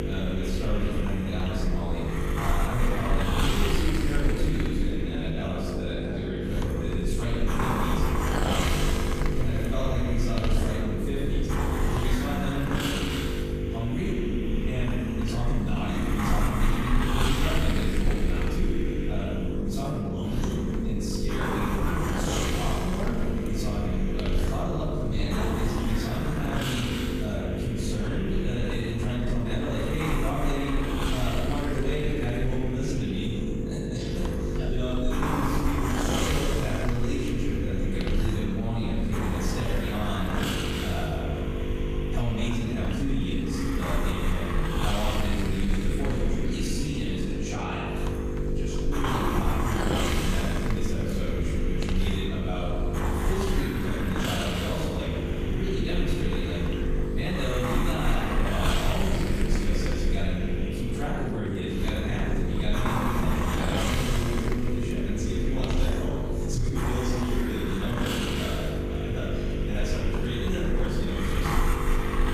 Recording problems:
room echo; strong; dies away in 1.5 s
off-mic speech; far
squashed, flat; somewhat
electrical hum; loud; throughout; 50 Hz, 5 dB below the speech
hiss; loud; throughout; 1 dB below the speech
murmuring crowd; faint; throughout; 20 dB below the speech

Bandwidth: 14.5 kHz